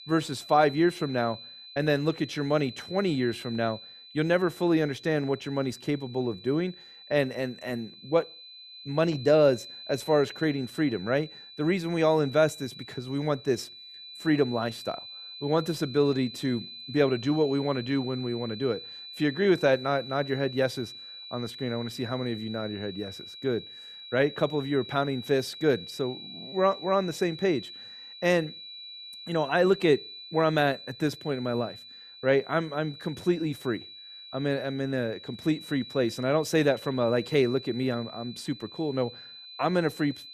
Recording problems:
high-pitched whine; noticeable; throughout; 4 kHz, 15 dB below the speech

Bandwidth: 14 kHz